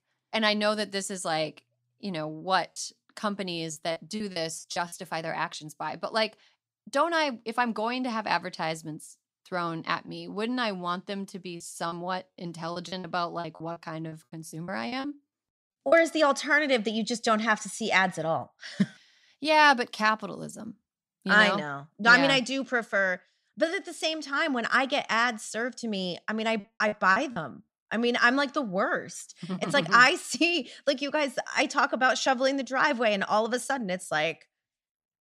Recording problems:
choppy; very; from 3.5 to 5 s, from 12 to 16 s and at 27 s; 14% of the speech affected

